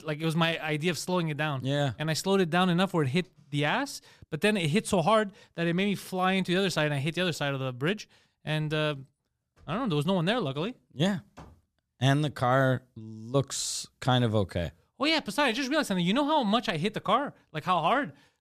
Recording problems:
none

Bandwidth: 14.5 kHz